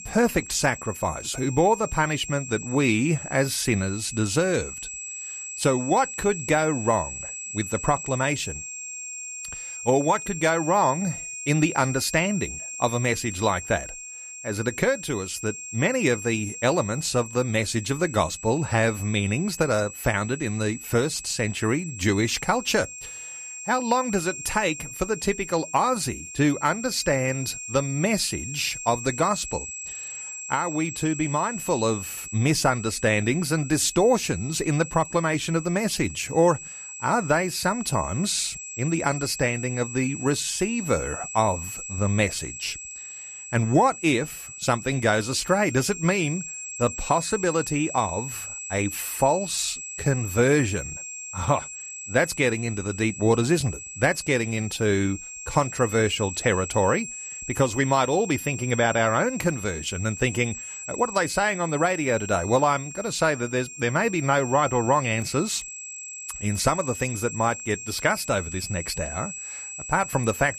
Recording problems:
high-pitched whine; loud; throughout; 7.5 kHz, 10 dB below the speech

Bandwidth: 14.5 kHz